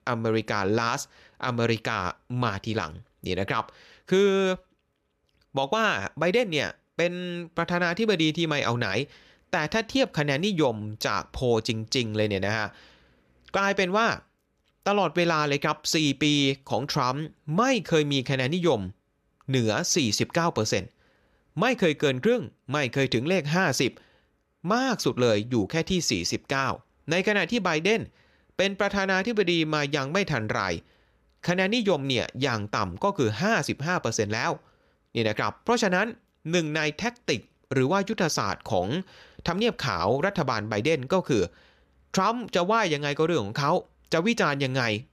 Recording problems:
none

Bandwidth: 14.5 kHz